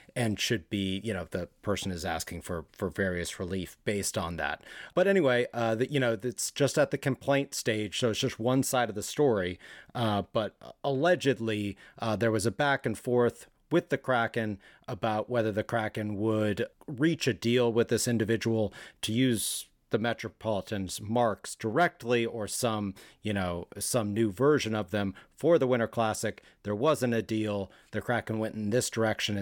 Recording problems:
abrupt cut into speech; at the end

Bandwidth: 17 kHz